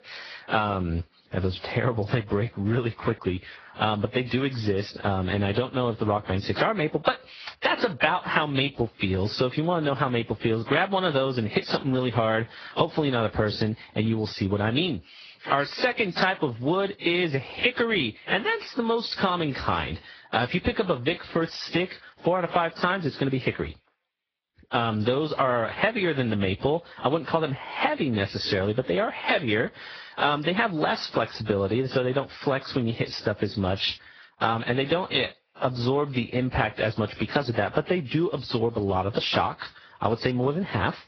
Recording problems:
garbled, watery; badly
high frequencies cut off; noticeable; nothing above 5.5 kHz
squashed, flat; somewhat

